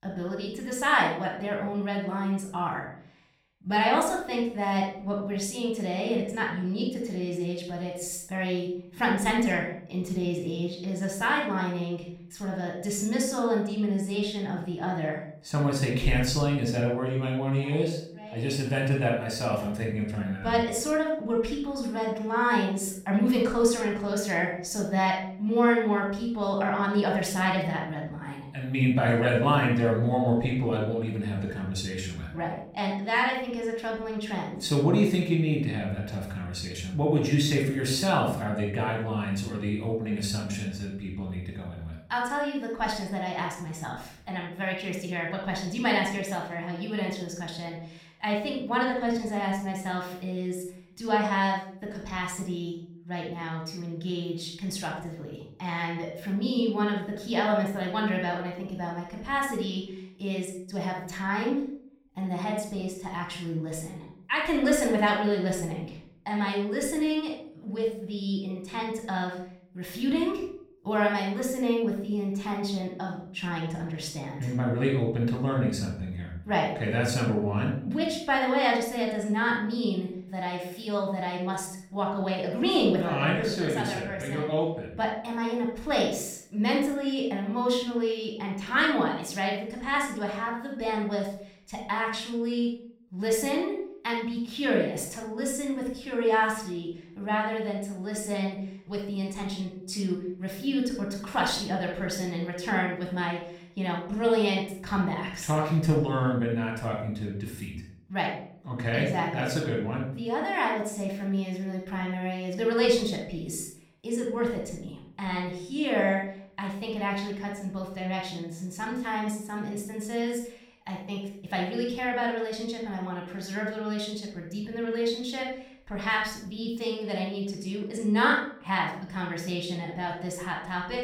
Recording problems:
room echo; noticeable; dies away in 0.5 s
off-mic speech; somewhat distant

